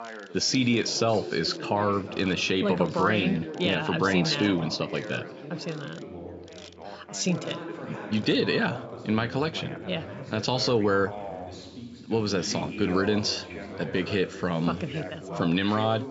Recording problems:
high frequencies cut off; noticeable; nothing above 8 kHz
background chatter; noticeable; throughout; 3 voices, 10 dB below the speech
machinery noise; faint; throughout; 25 dB below the speech

